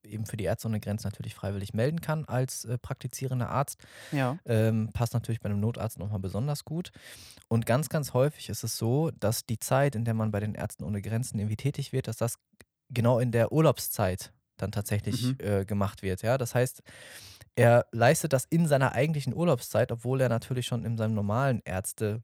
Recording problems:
none

